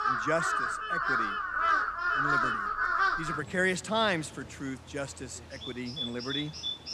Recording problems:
animal sounds; very loud; throughout; 5 dB above the speech

